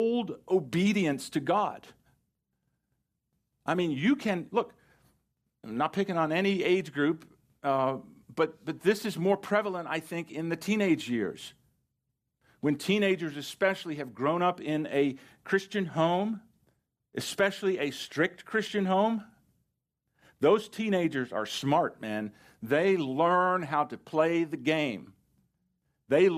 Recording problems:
abrupt cut into speech; at the start and the end

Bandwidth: 14.5 kHz